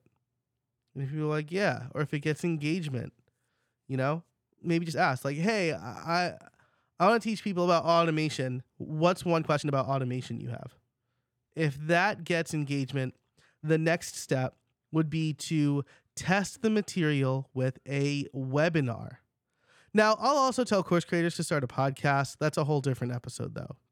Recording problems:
uneven, jittery; strongly; from 0.5 to 22 s

